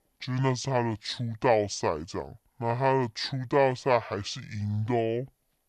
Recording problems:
wrong speed and pitch; too slow and too low; 0.6 times normal speed

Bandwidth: 12.5 kHz